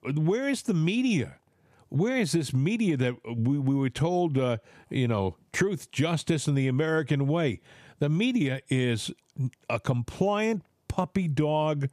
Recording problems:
squashed, flat; somewhat

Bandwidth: 14.5 kHz